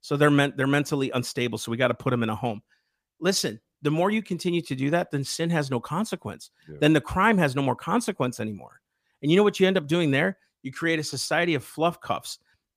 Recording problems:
none

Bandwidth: 15 kHz